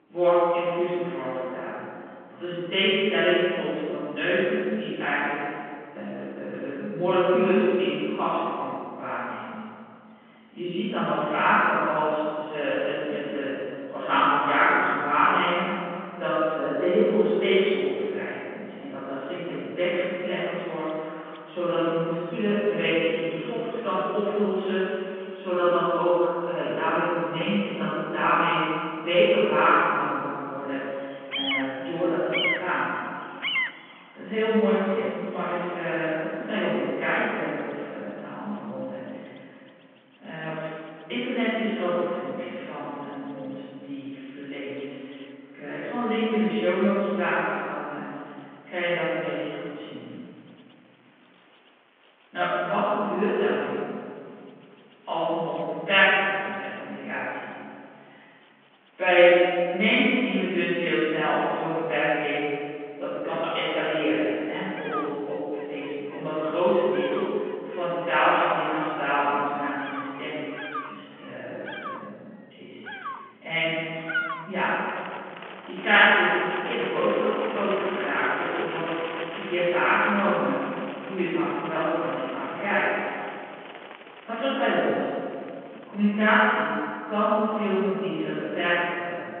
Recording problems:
room echo; strong; dies away in 2.2 s
off-mic speech; far
phone-call audio; nothing above 3 kHz
animal sounds; noticeable; throughout; 10 dB below the speech

